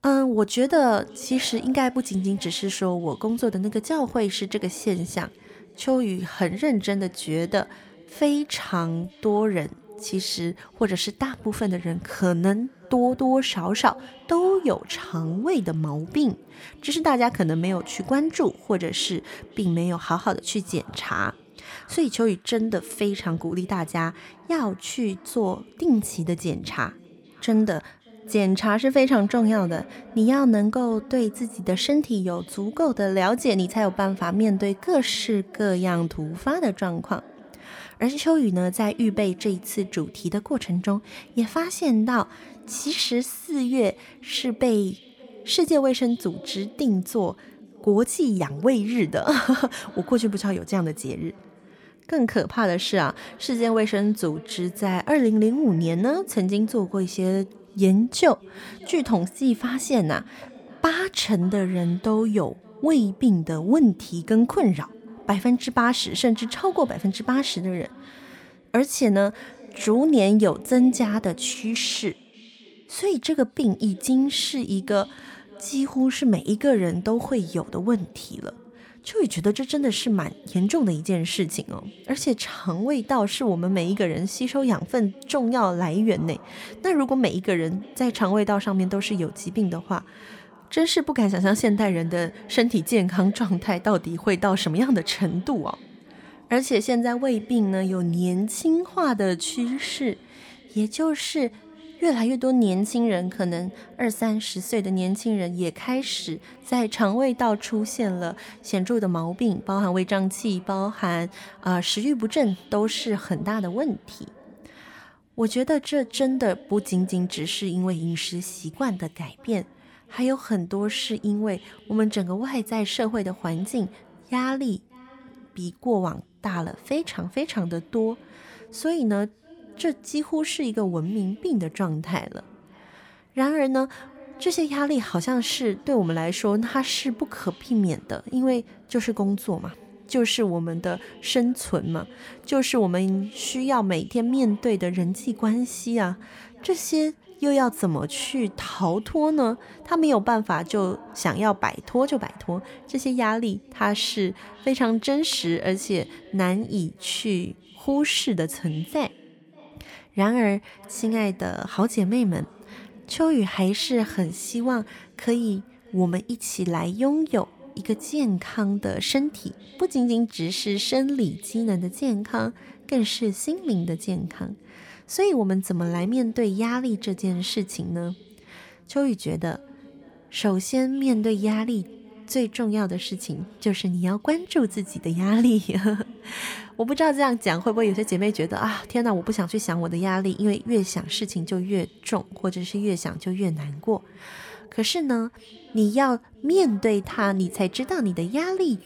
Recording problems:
echo of what is said; faint; throughout; 580 ms later, 25 dB below the speech

